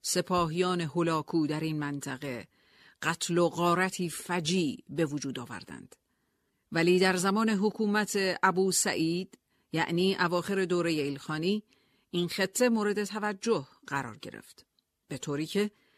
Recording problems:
none

